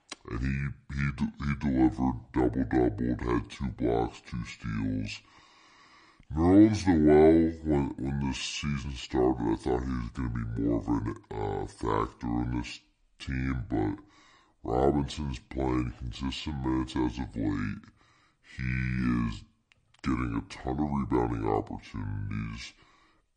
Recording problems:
wrong speed and pitch; too slow and too low; 0.6 times normal speed

